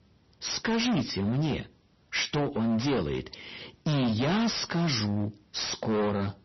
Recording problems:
distortion; heavy; 26% of the sound clipped
garbled, watery; slightly; nothing above 6 kHz

